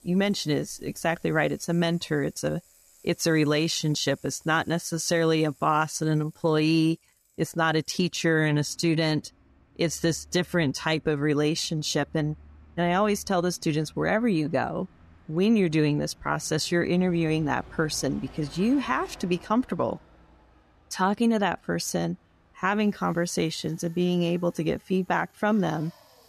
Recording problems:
traffic noise; faint; throughout; 25 dB below the speech

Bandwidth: 14 kHz